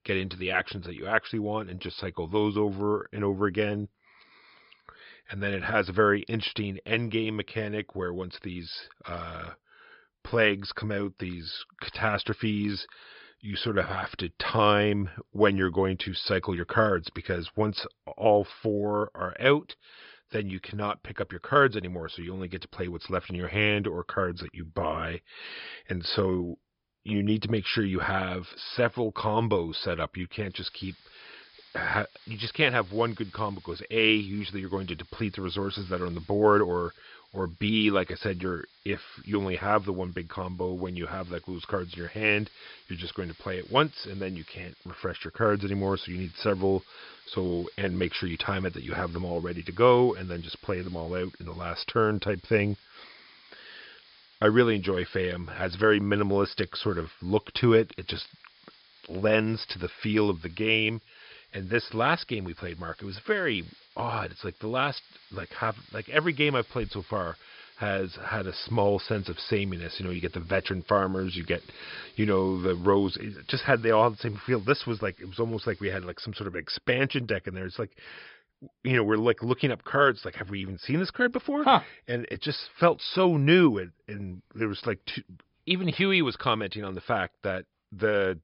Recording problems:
high frequencies cut off; noticeable; nothing above 5.5 kHz
hiss; faint; from 31 s to 1:16; 25 dB below the speech

